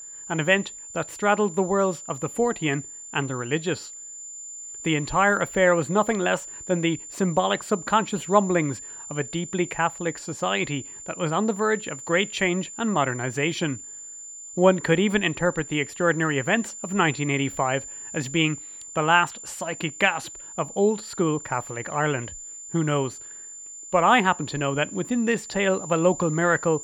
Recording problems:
high-pitched whine; noticeable; throughout; 7 kHz, 10 dB below the speech

